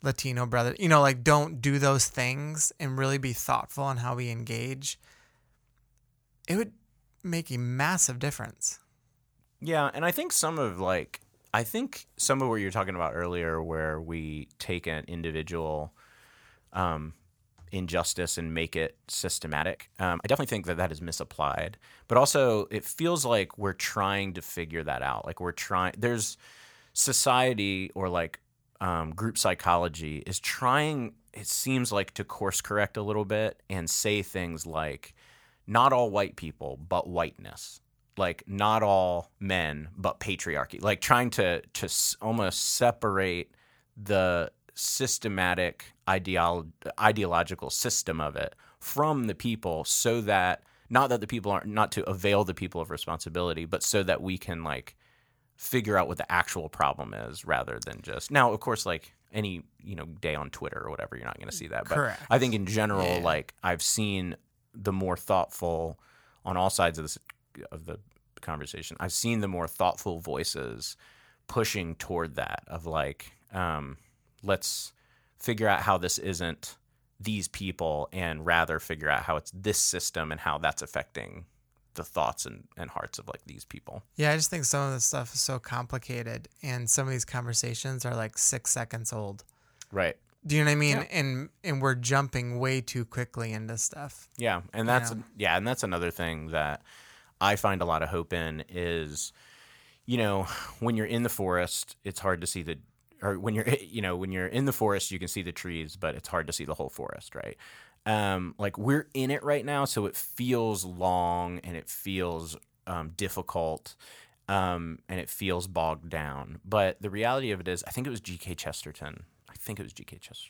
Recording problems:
uneven, jittery; strongly; from 13 s to 1:35

